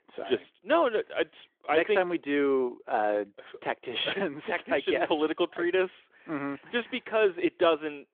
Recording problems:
phone-call audio; nothing above 3.5 kHz

